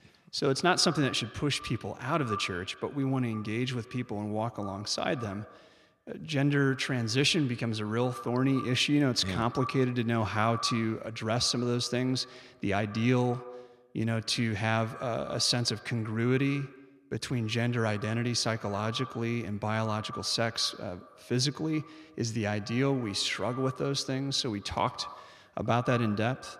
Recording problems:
echo of what is said; noticeable; throughout; 80 ms later, 15 dB below the speech

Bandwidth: 14.5 kHz